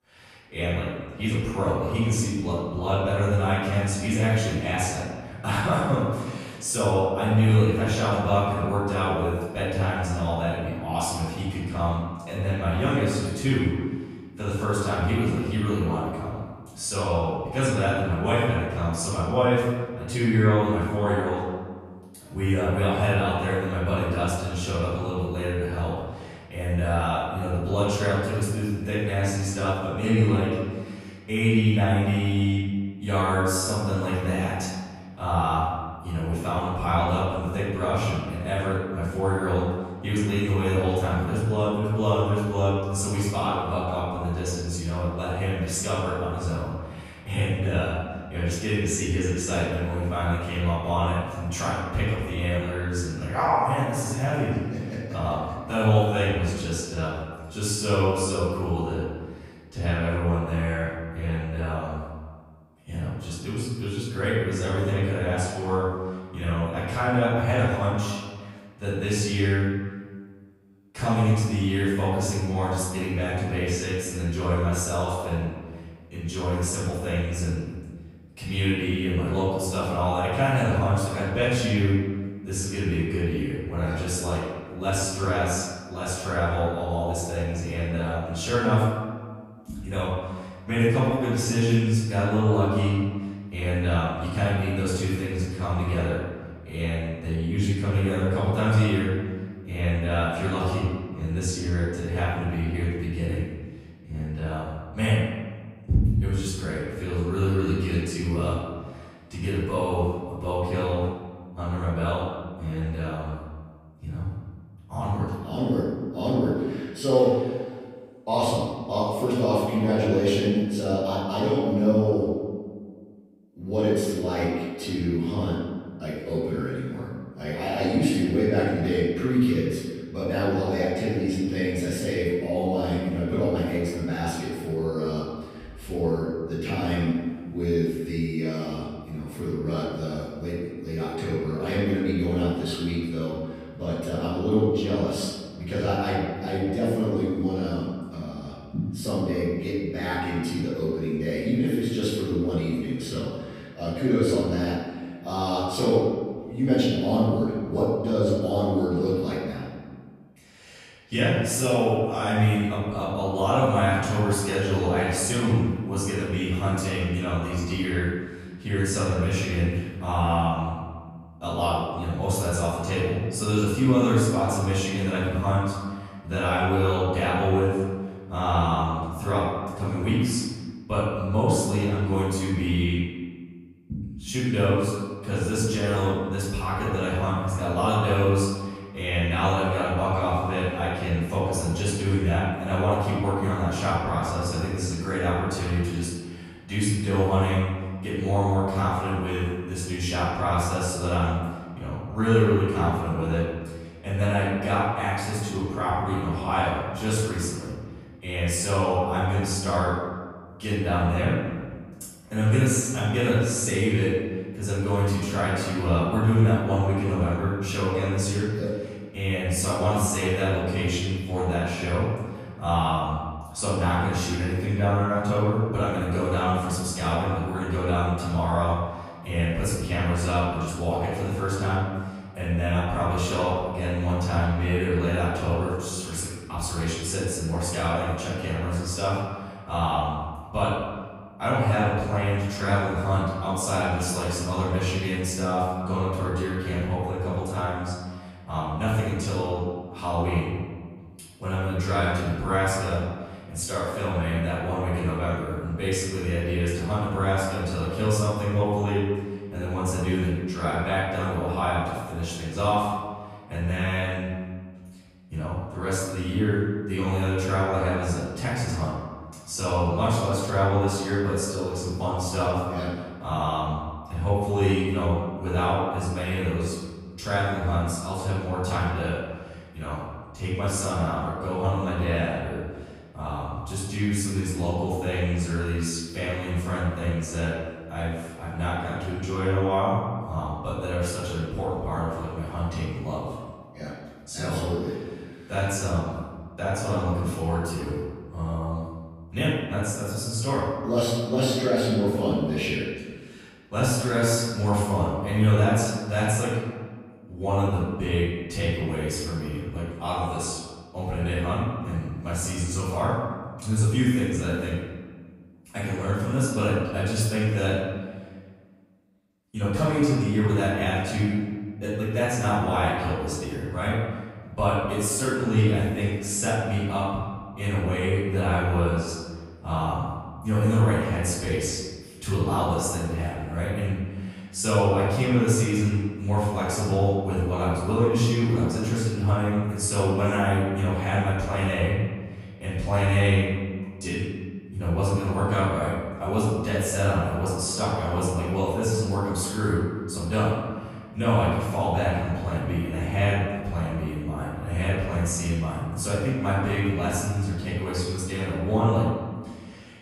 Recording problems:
room echo; strong; dies away in 1.4 s
off-mic speech; far

